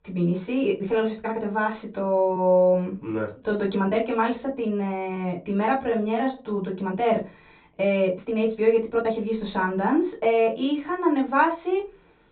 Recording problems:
high frequencies cut off; severe; nothing above 4 kHz
room echo; very slight; dies away in 0.2 s
off-mic speech; somewhat distant
uneven, jittery; strongly; from 1 to 11 s

